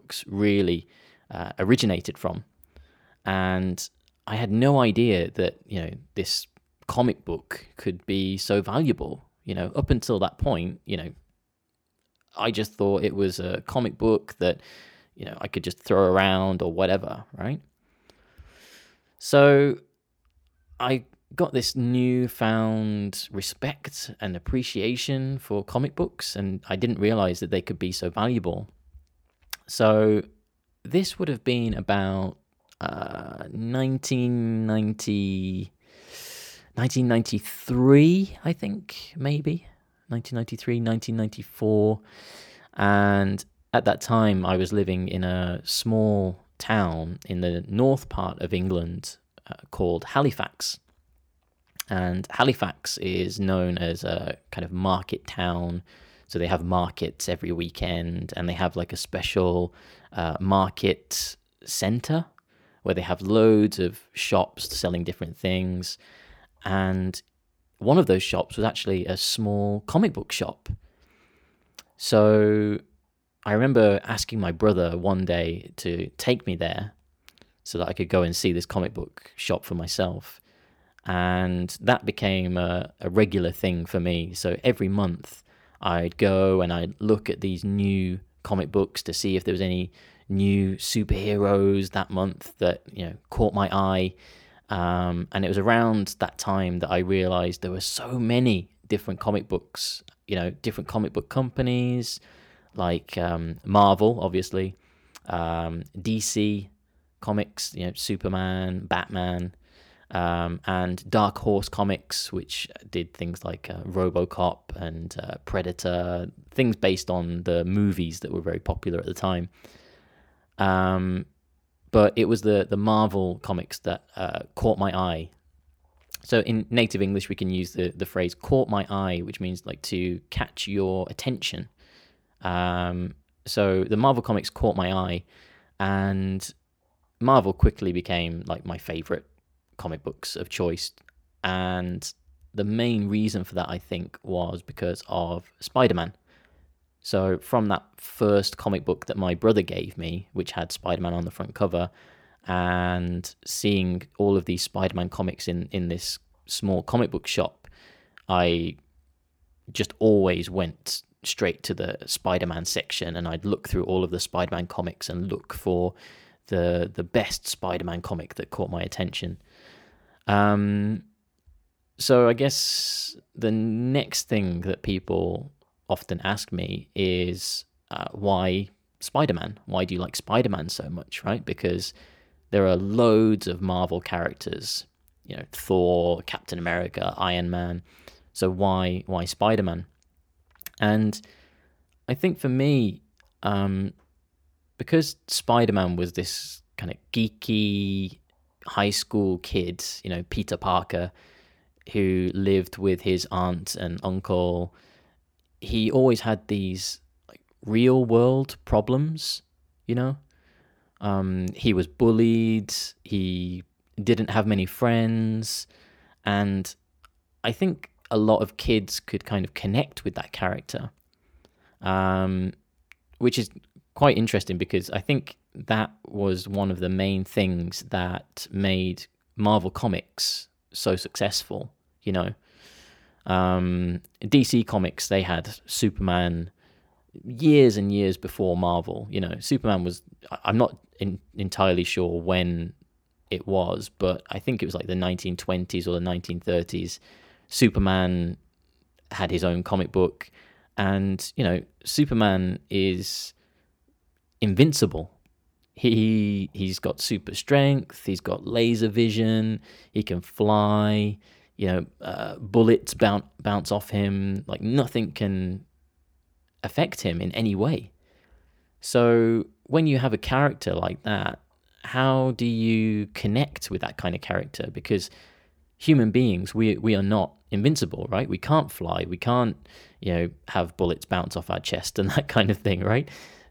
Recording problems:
none

